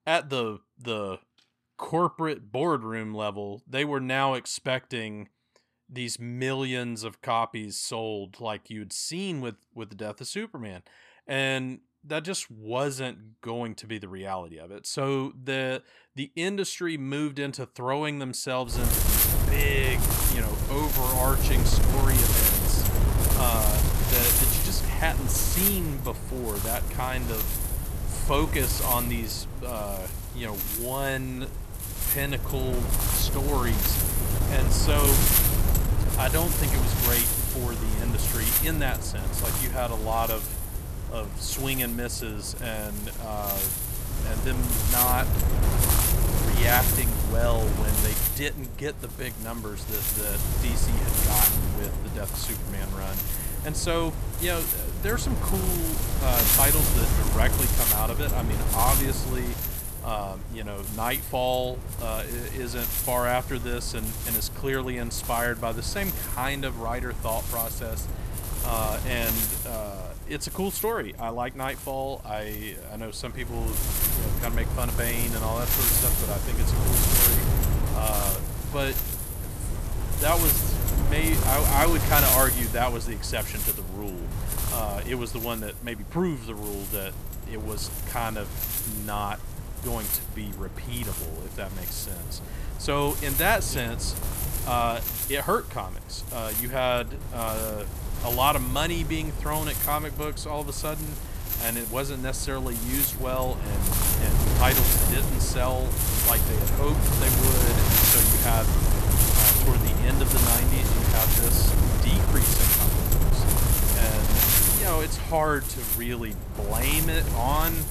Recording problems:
wind noise on the microphone; heavy; from 19 s on; 1 dB below the speech

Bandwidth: 13.5 kHz